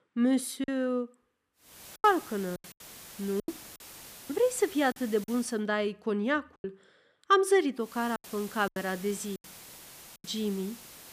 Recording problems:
hiss; noticeable; from 1.5 to 5.5 s and from 8 s on; 15 dB below the speech
choppy; very; 10% of the speech affected

